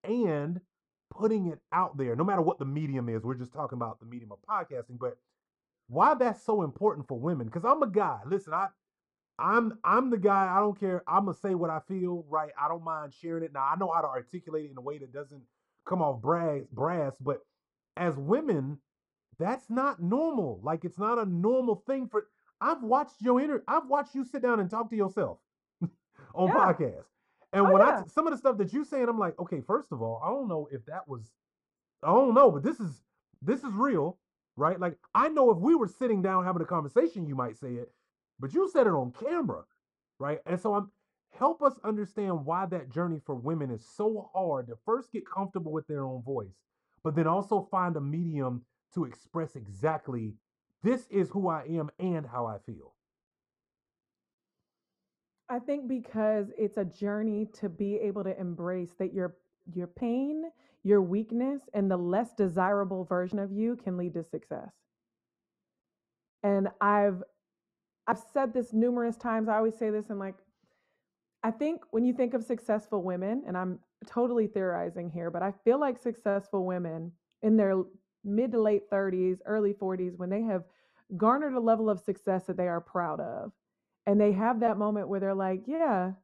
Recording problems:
muffled; very; fading above 1.5 kHz

